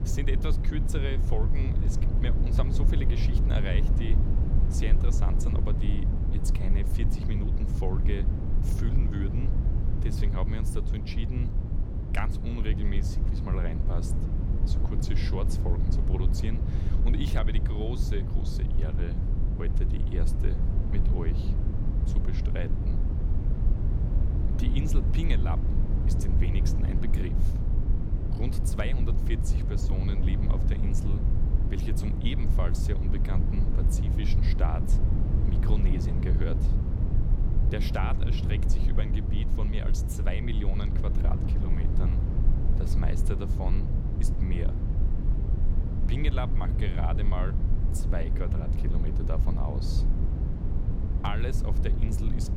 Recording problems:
low rumble; loud; throughout; 2 dB below the speech

